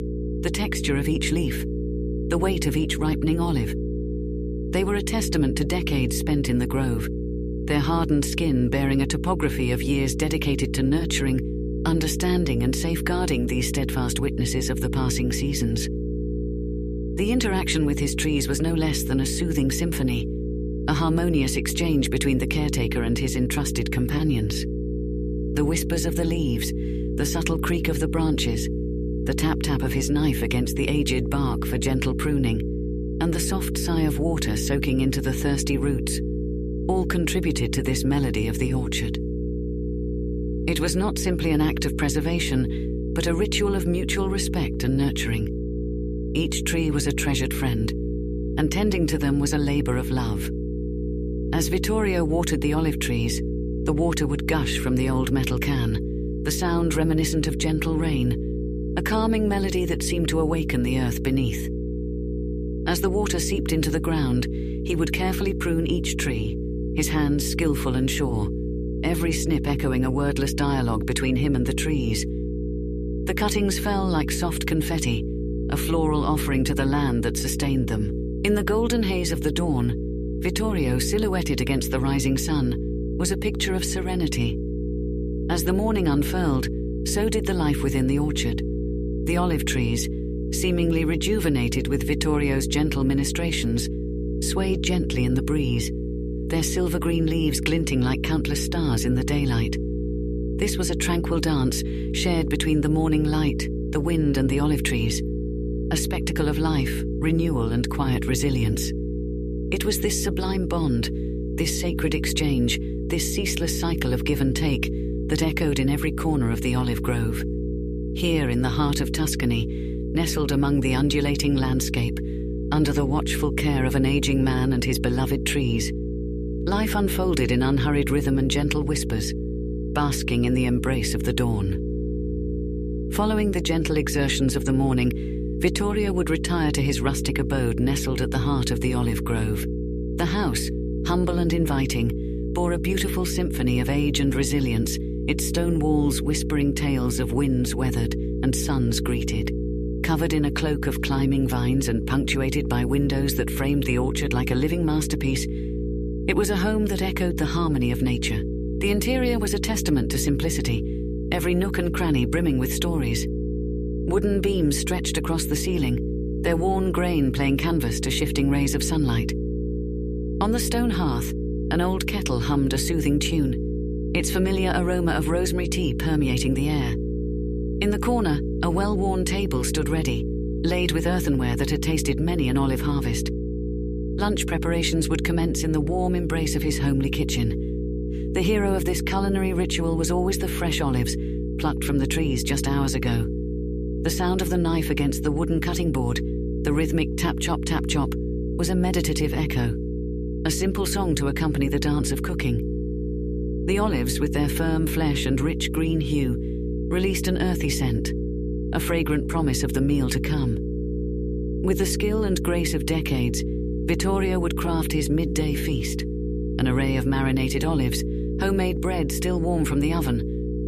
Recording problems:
electrical hum; loud; throughout; 60 Hz, 6 dB below the speech

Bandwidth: 14.5 kHz